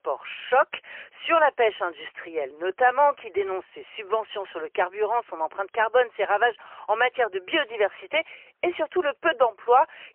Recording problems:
phone-call audio; poor line; nothing above 3 kHz

